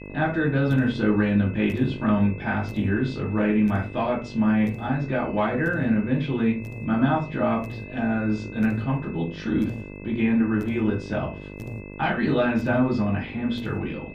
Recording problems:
off-mic speech; far
muffled; slightly; fading above 3.5 kHz
room echo; very slight; dies away in 0.3 s
electrical hum; noticeable; throughout; 50 Hz, 15 dB below the speech
high-pitched whine; noticeable; throughout; 2.5 kHz, 20 dB below the speech

